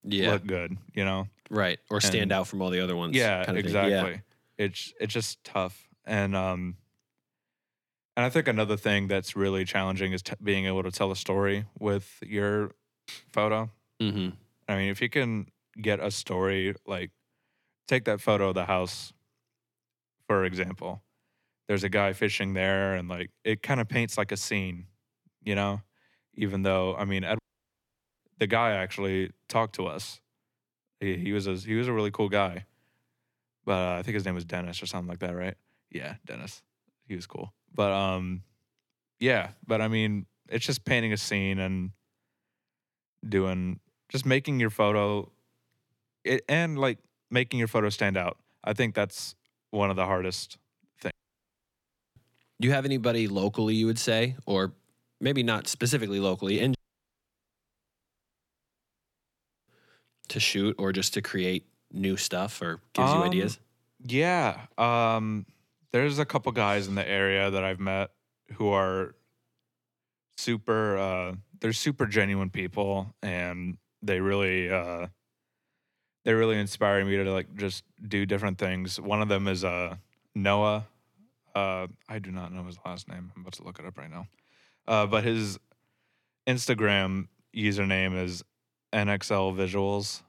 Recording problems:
audio cutting out; at 27 s for 1 s, at 51 s for 1 s and at 57 s for 3 s

